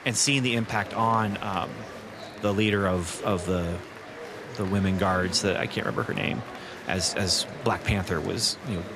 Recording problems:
murmuring crowd; noticeable; throughout; 15 dB below the speech

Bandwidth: 14.5 kHz